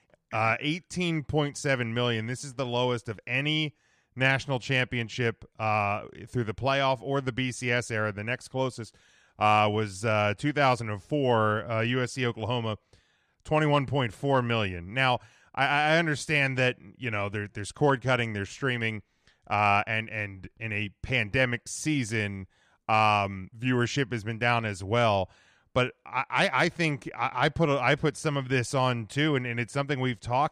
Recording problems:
none

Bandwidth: 14.5 kHz